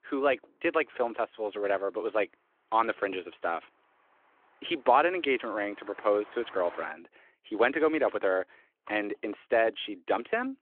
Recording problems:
phone-call audio
traffic noise; faint; throughout; 25 dB below the speech

